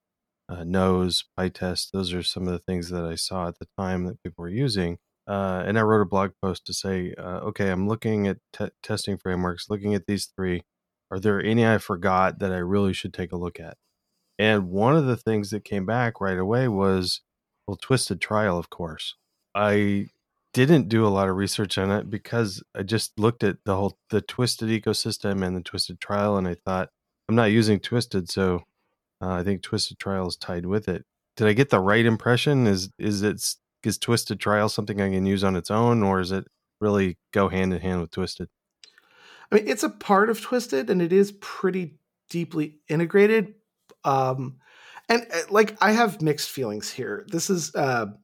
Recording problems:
none

